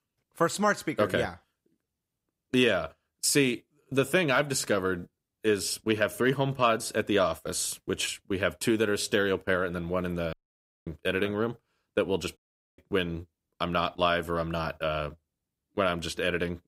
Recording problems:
audio cutting out; at 10 s for 0.5 s and at 12 s

